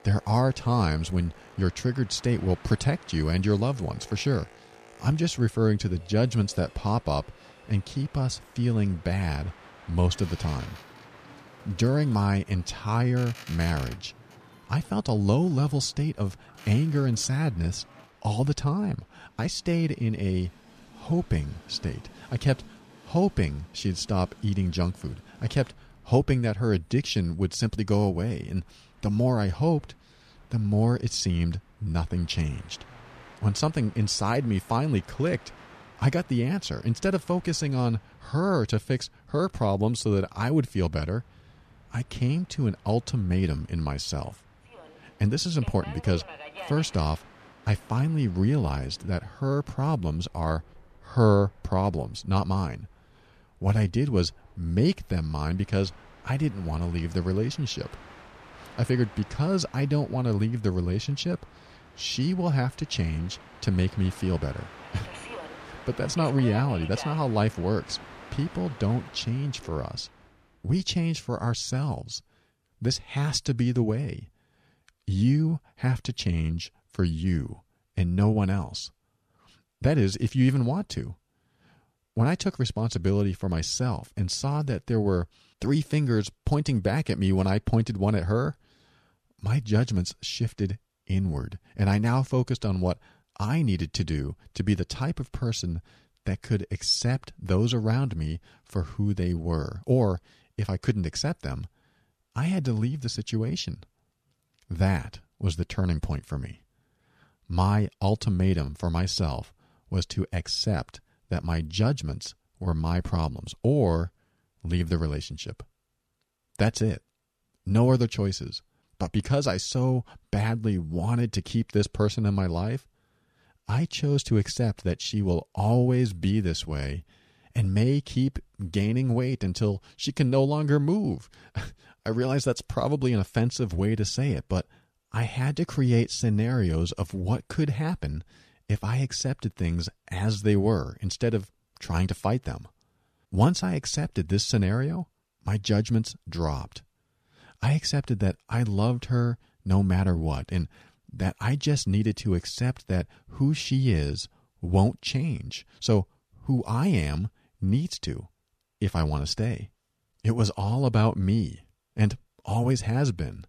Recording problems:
train or aircraft noise; faint; until 1:10; 20 dB below the speech

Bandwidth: 14.5 kHz